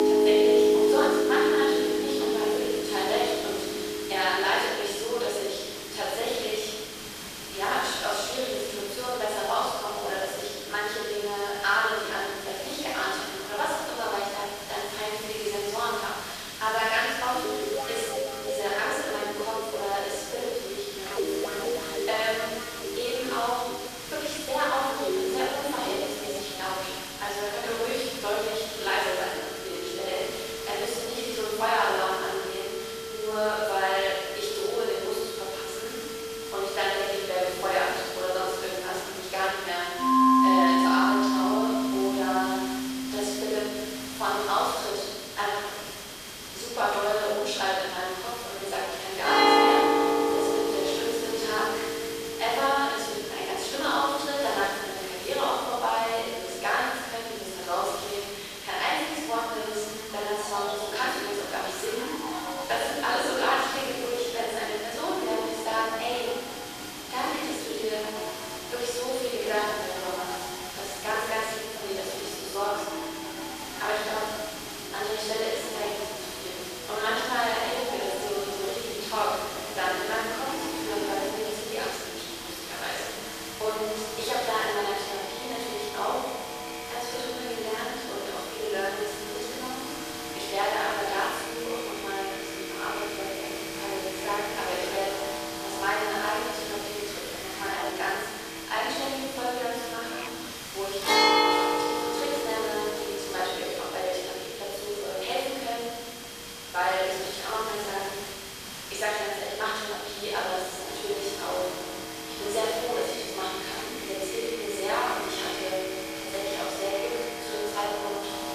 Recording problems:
room echo; strong; dies away in 1.5 s
off-mic speech; far
thin; somewhat; fading below 300 Hz
background music; loud; throughout; 1 dB below the speech
hiss; loud; throughout; 8 dB below the speech
high-pitched whine; noticeable; throughout; 3 kHz, 20 dB below the speech

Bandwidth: 14.5 kHz